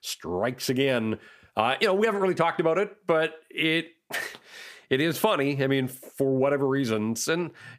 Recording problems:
squashed, flat; heavily

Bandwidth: 15 kHz